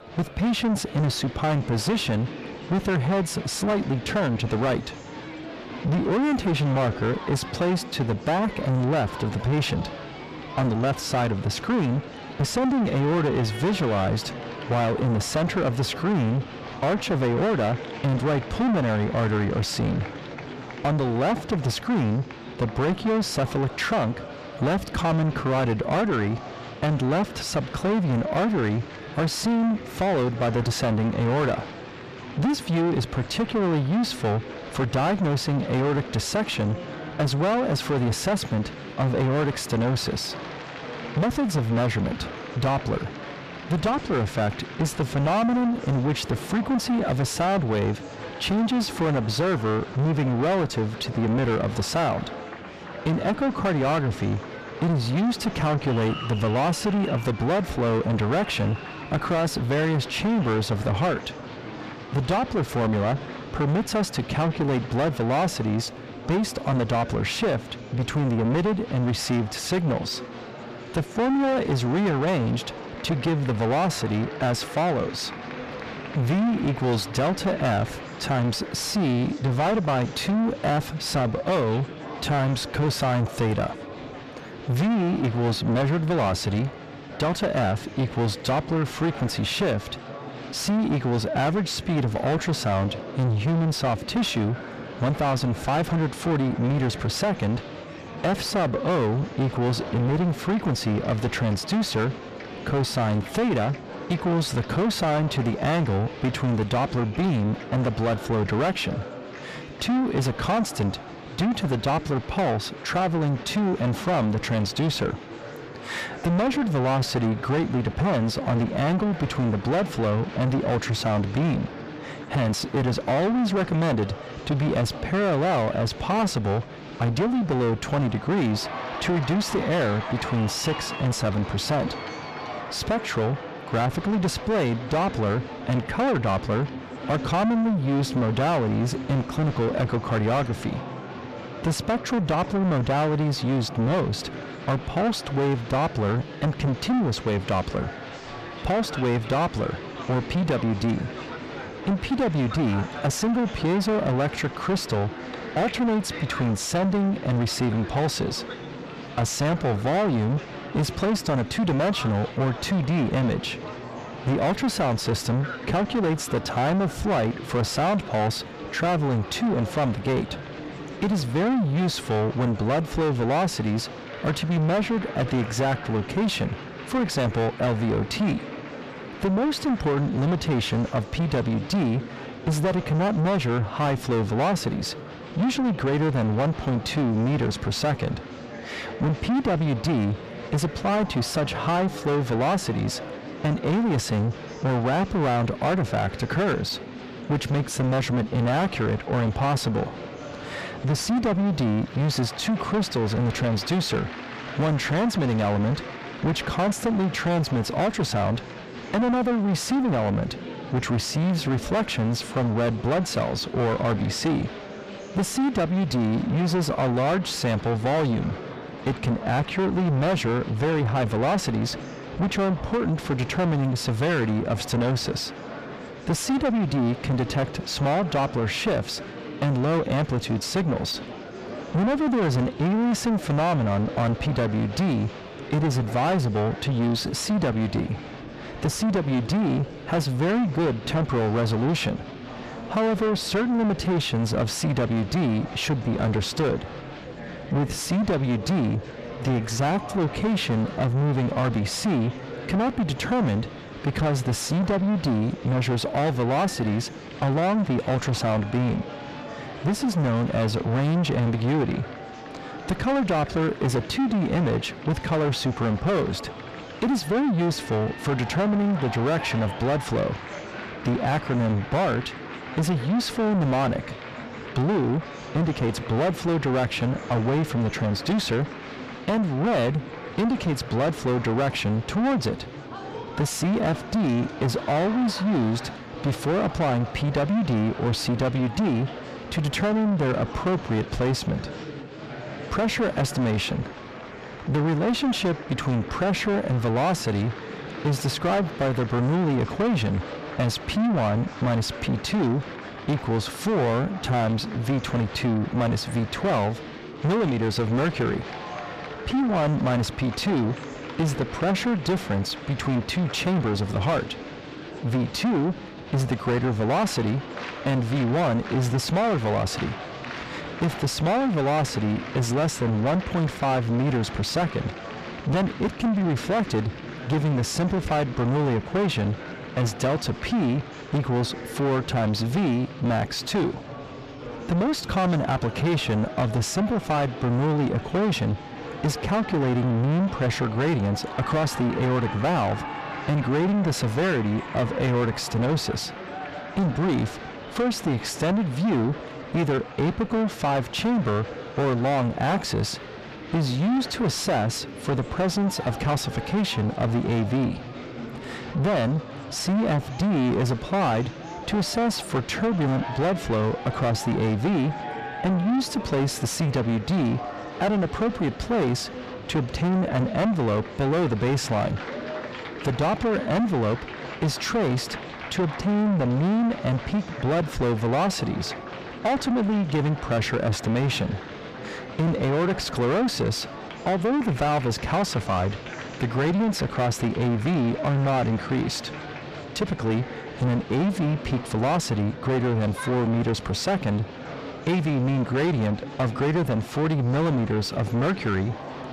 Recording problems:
distortion; heavy; 5 dB below the speech
murmuring crowd; noticeable; throughout; 15 dB below the speech

